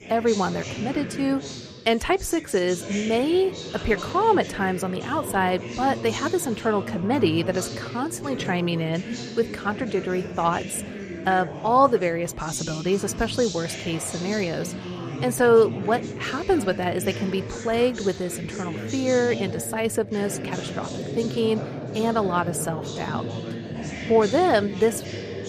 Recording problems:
background chatter; loud; throughout; 4 voices, 9 dB below the speech

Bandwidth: 14.5 kHz